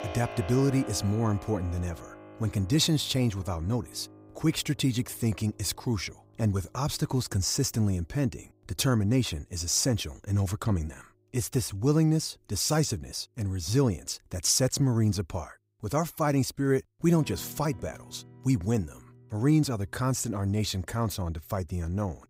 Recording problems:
background music; noticeable; throughout; 20 dB below the speech

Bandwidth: 15.5 kHz